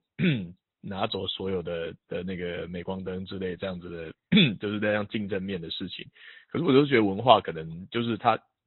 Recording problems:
high frequencies cut off; severe; nothing above 4 kHz
garbled, watery; slightly

